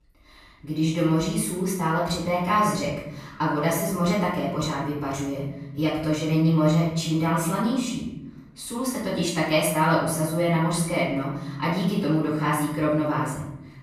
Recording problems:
off-mic speech; far
room echo; noticeable; dies away in 0.9 s

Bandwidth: 14.5 kHz